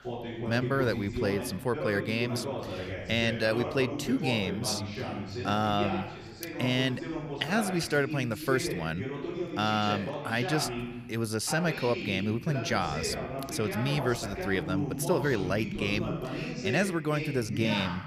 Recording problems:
voice in the background; loud; throughout; 5 dB below the speech

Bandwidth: 15.5 kHz